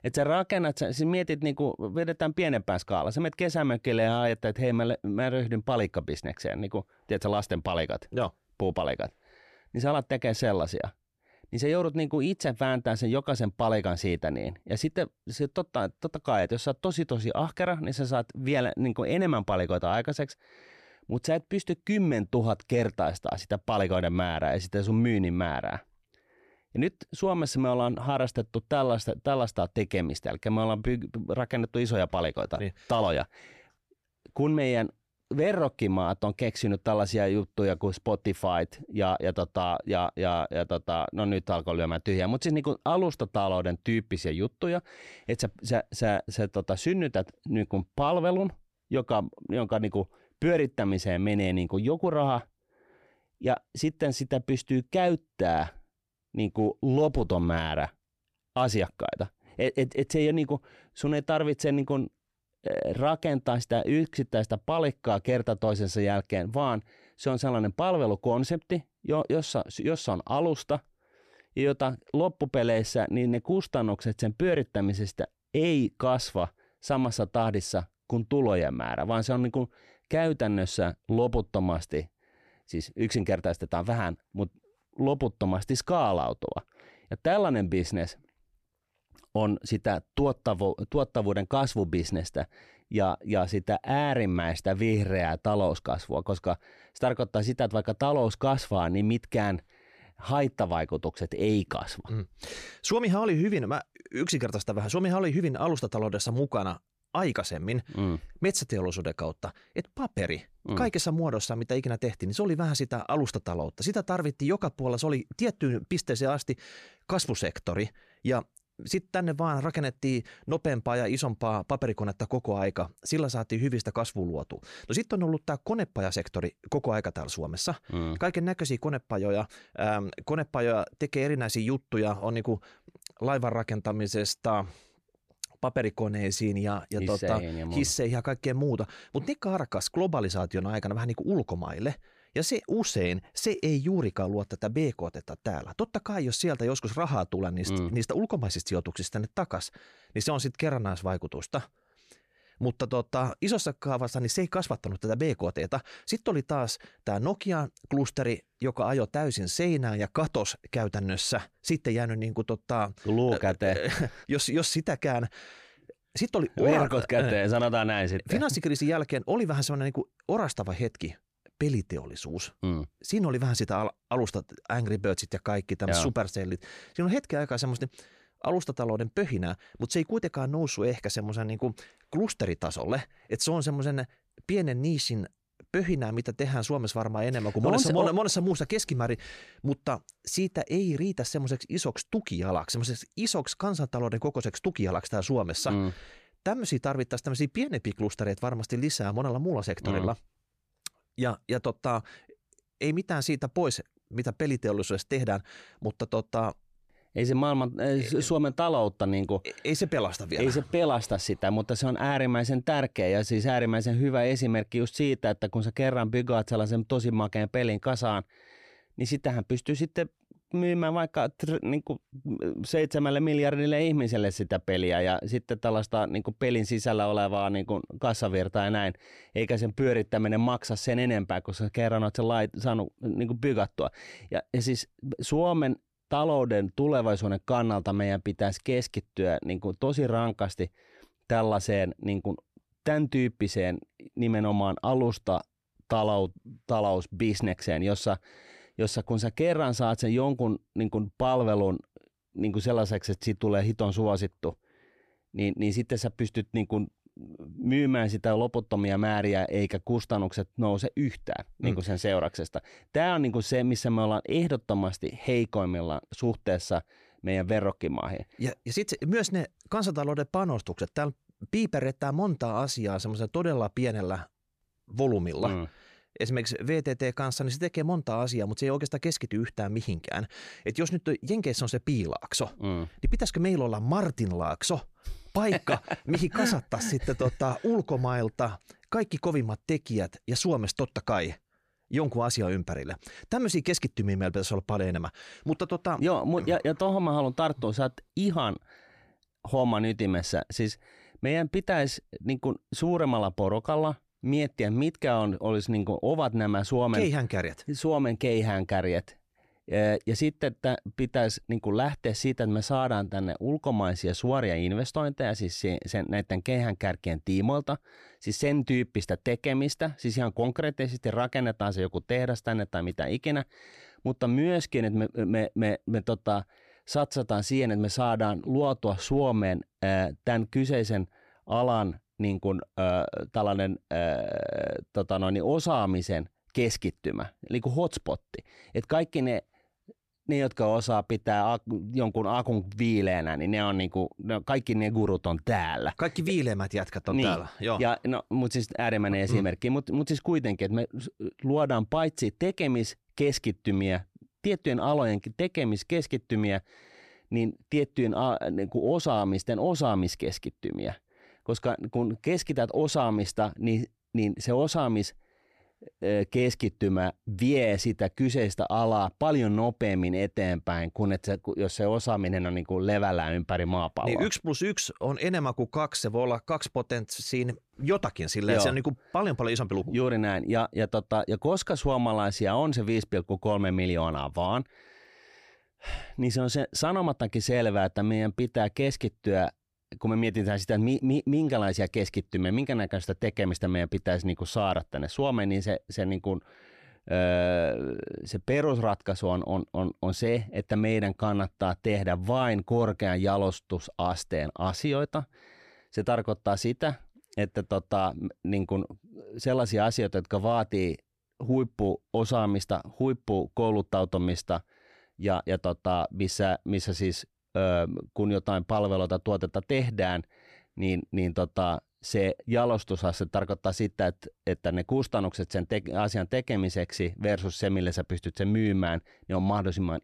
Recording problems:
none

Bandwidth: 14.5 kHz